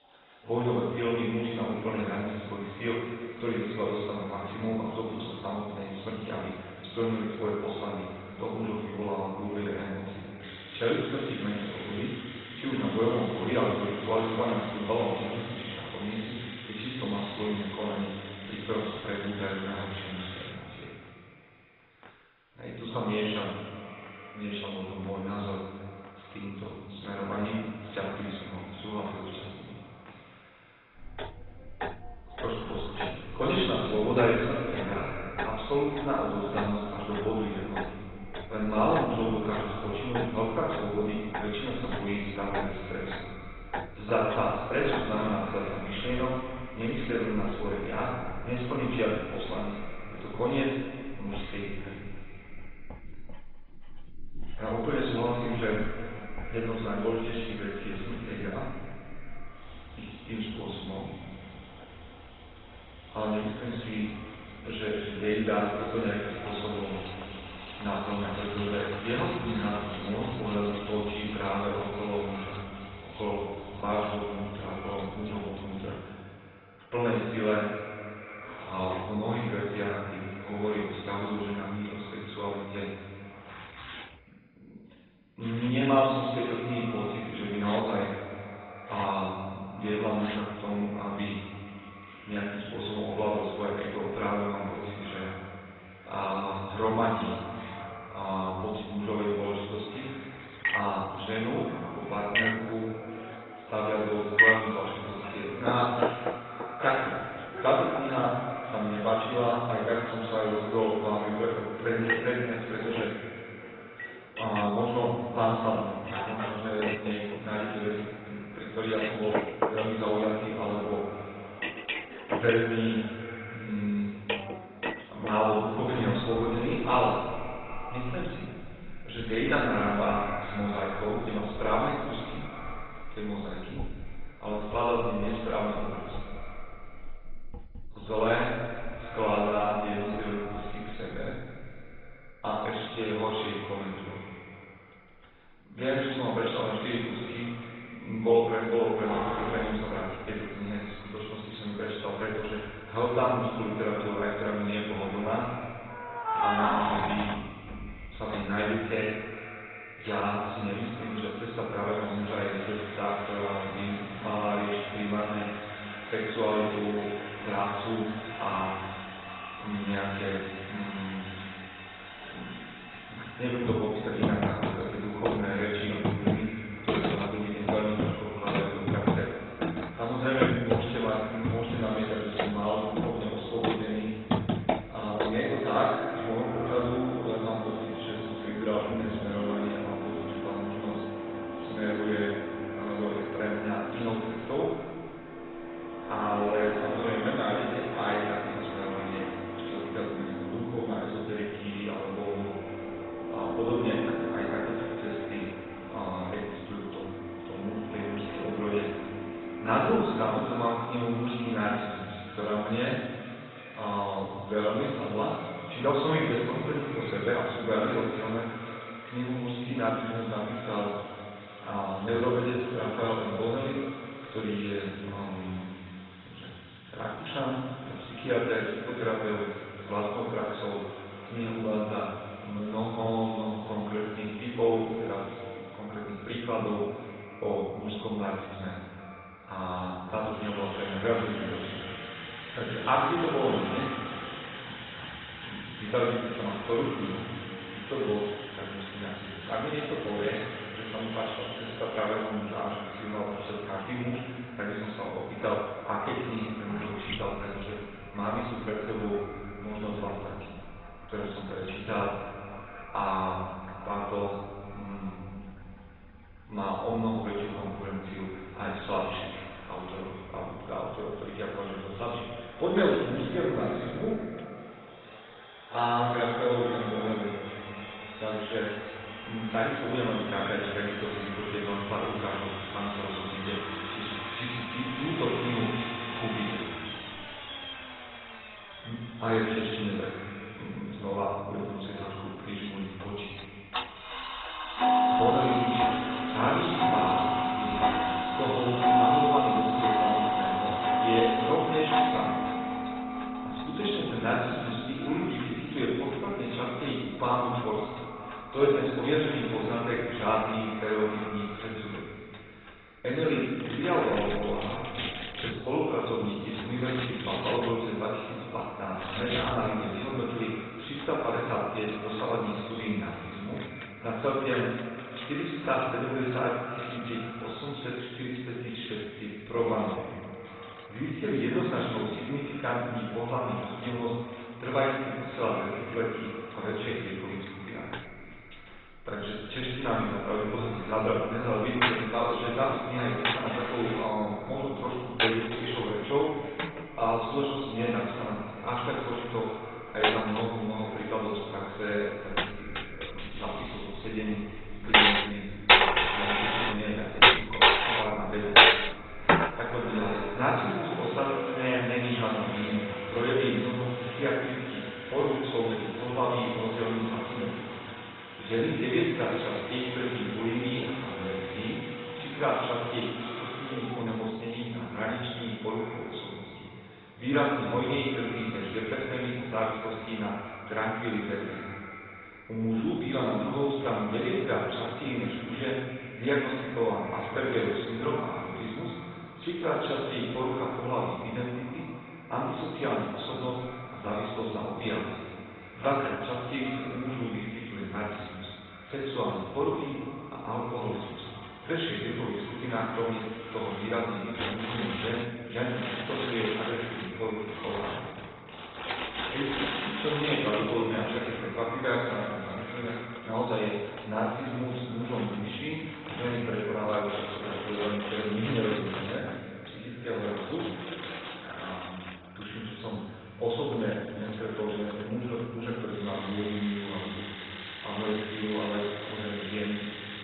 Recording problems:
off-mic speech; far
garbled, watery; badly; nothing above 4 kHz
echo of what is said; noticeable; throughout; 350 ms later, 15 dB below the speech
room echo; noticeable; dies away in 1.5 s
household noises; loud; throughout; 1 dB below the speech

